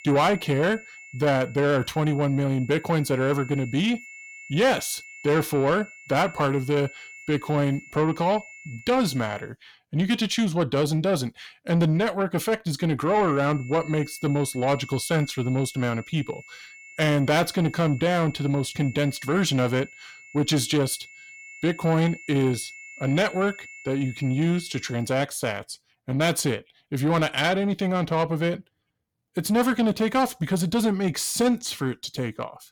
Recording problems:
distortion; slight; 10 dB below the speech
high-pitched whine; noticeable; until 9.5 s and from 13 to 25 s; 2 kHz, 20 dB below the speech

